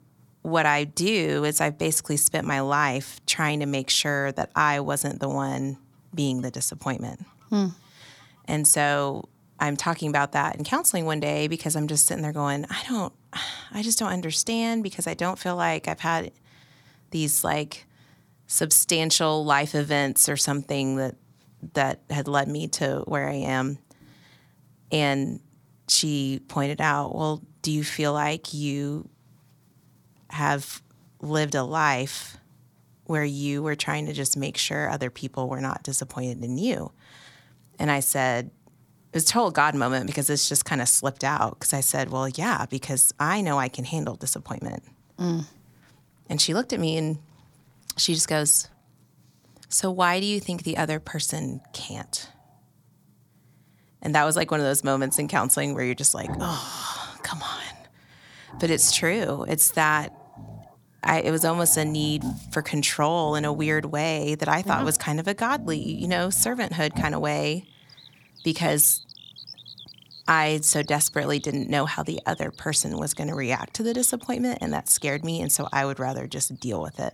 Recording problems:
animal sounds; noticeable; throughout; 20 dB below the speech

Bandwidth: 18.5 kHz